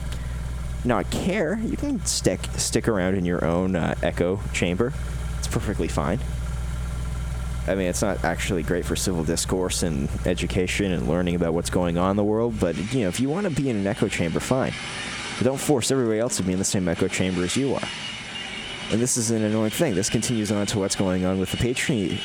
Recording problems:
squashed, flat; heavily, background pumping
traffic noise; loud; throughout; 10 dB below the speech

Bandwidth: 19 kHz